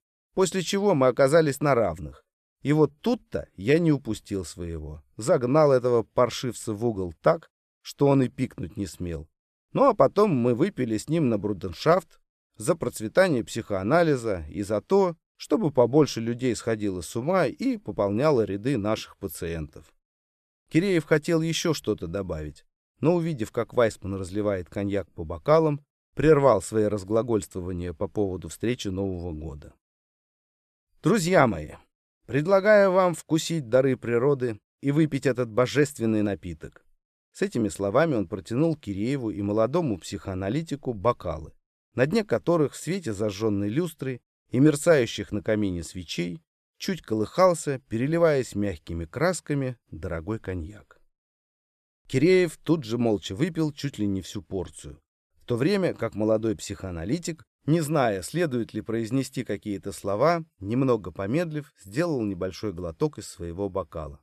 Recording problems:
none

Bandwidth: 14.5 kHz